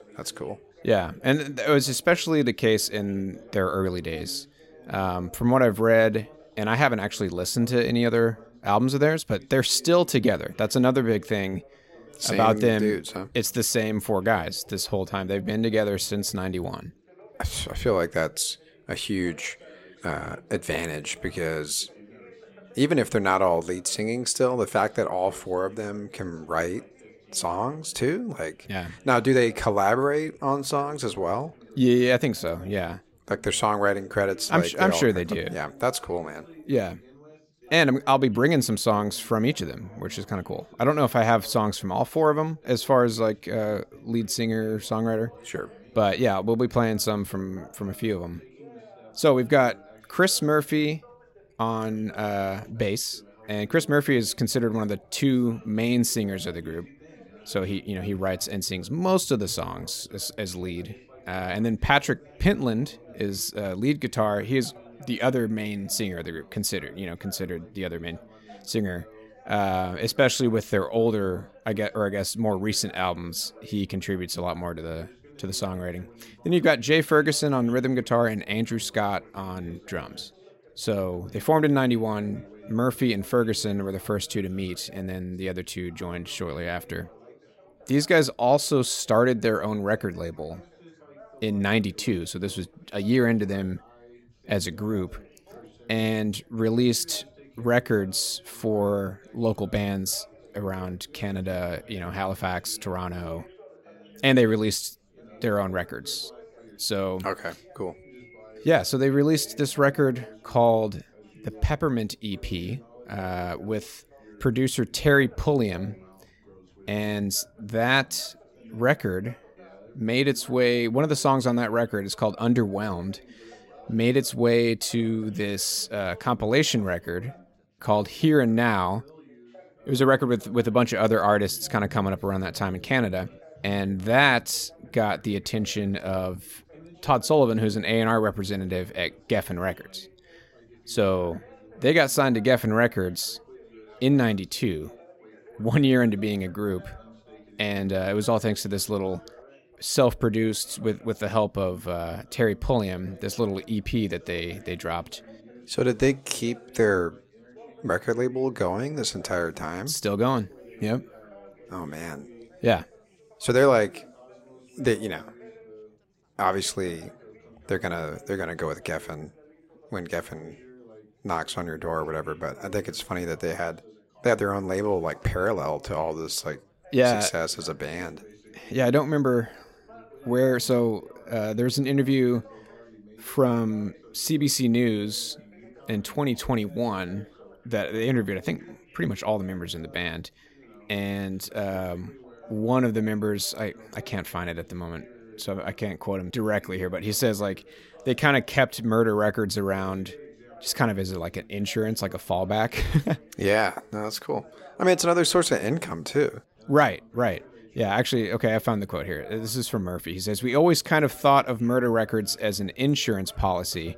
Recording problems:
chatter from many people; faint; throughout; 25 dB below the speech

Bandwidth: 16 kHz